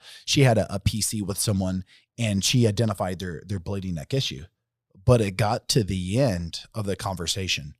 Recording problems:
none

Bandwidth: 15 kHz